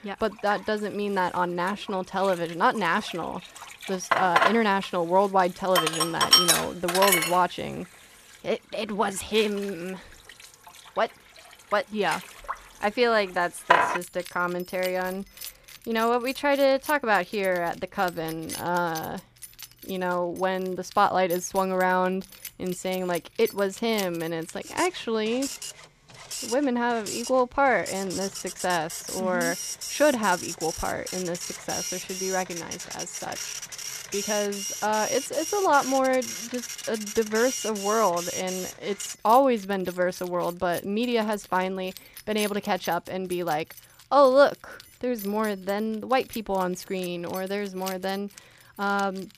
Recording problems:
household noises; loud; throughout; 4 dB below the speech

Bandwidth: 14.5 kHz